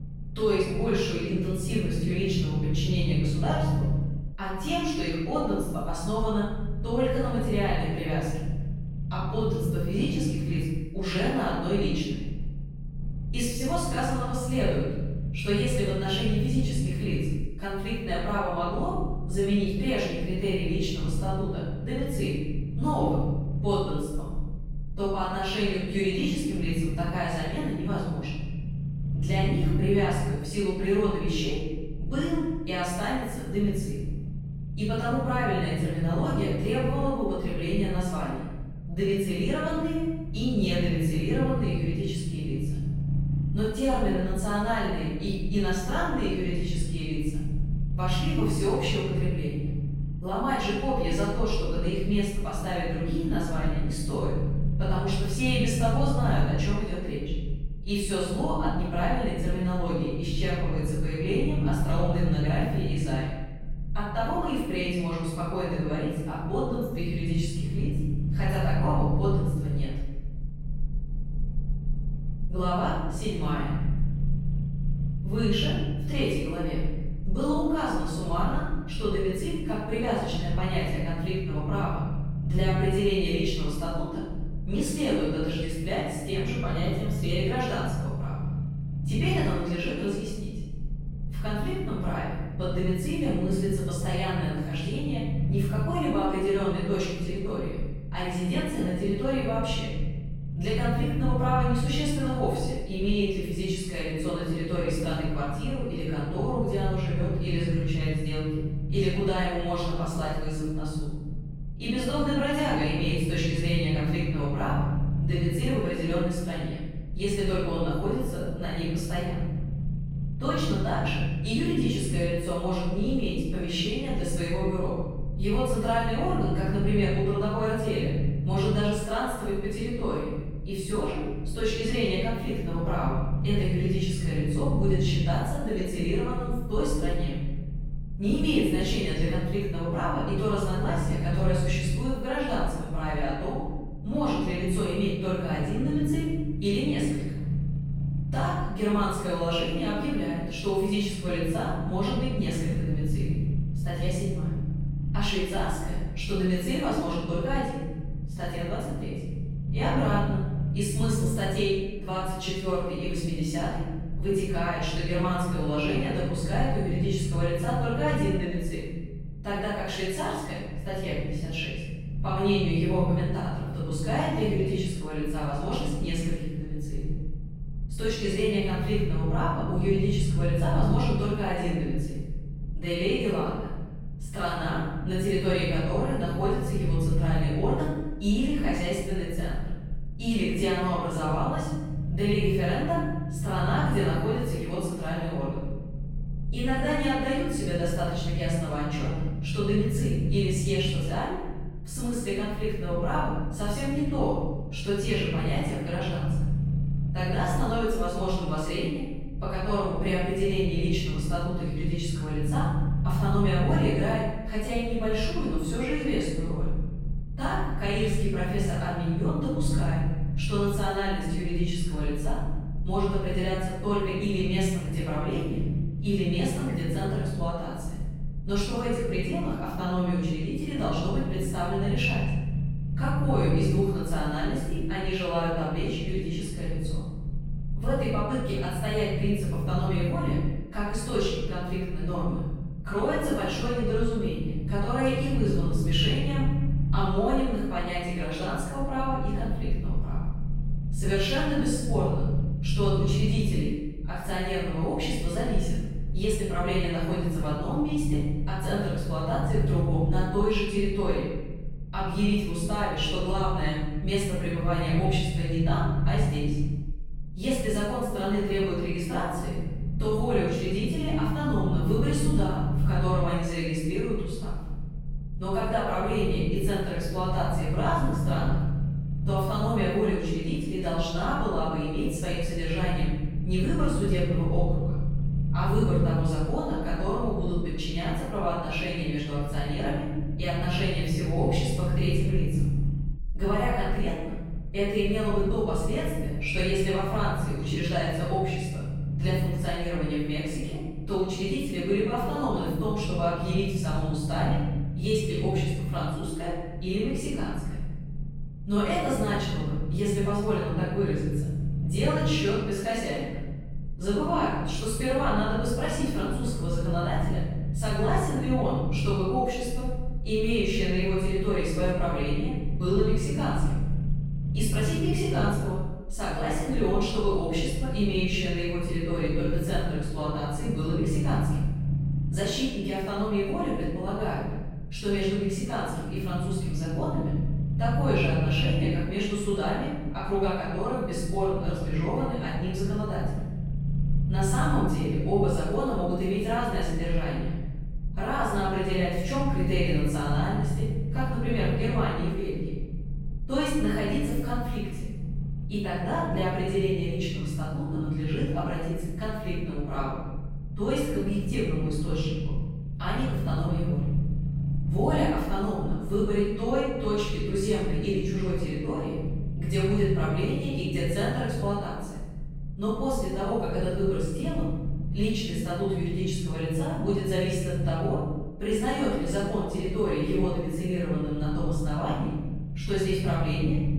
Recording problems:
room echo; strong; dies away in 1.6 s
off-mic speech; far
low rumble; noticeable; throughout; 10 dB below the speech

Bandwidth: 16.5 kHz